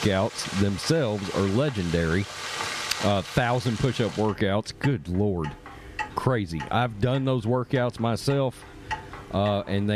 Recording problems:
squashed, flat; somewhat, background pumping
household noises; noticeable; throughout; 10 dB below the speech
abrupt cut into speech; at the end

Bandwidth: 14.5 kHz